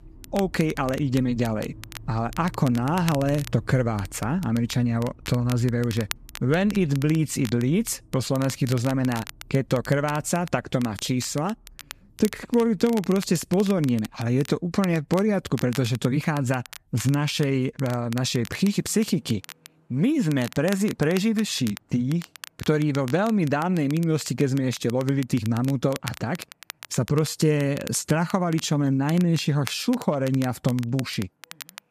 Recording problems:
crackle, like an old record; noticeable; 15 dB below the speech
traffic noise; faint; throughout; 25 dB below the speech

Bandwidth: 14.5 kHz